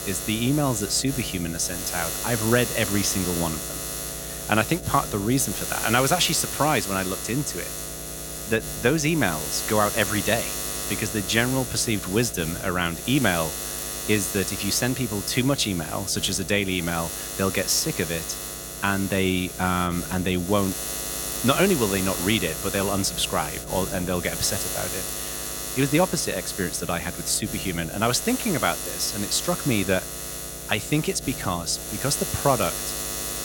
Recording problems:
electrical hum; loud; throughout; 60 Hz, 7 dB below the speech

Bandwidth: 17 kHz